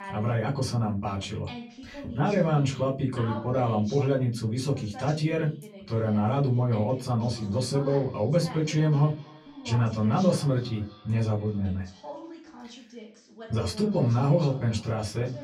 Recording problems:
off-mic speech; far
echo of what is said; faint; from 7 s on; 250 ms later, 25 dB below the speech
room echo; very slight; dies away in 0.3 s
voice in the background; noticeable; throughout; 15 dB below the speech

